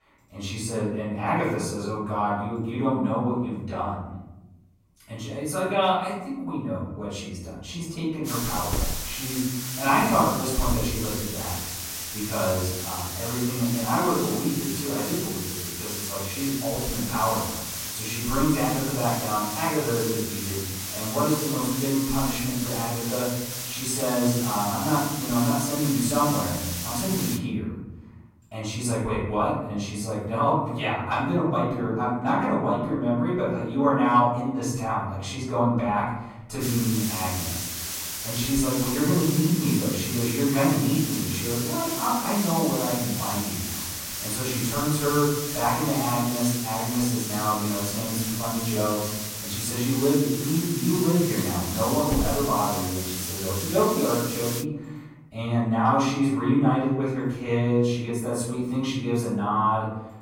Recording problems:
off-mic speech; far
room echo; noticeable; dies away in 1.2 s
hiss; loud; from 8.5 to 27 s and from 37 to 55 s; 4 dB below the speech

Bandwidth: 16.5 kHz